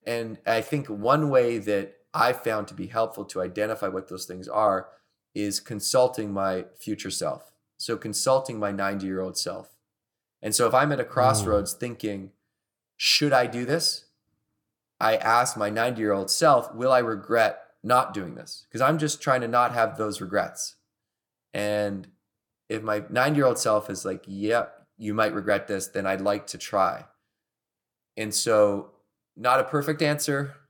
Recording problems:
none

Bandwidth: 18.5 kHz